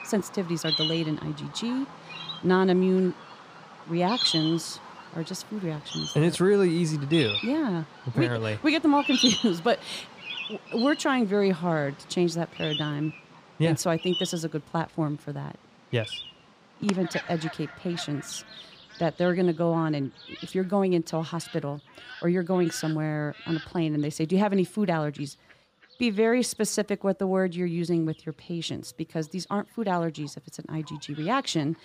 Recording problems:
animal sounds; loud; throughout; 6 dB below the speech

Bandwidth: 15 kHz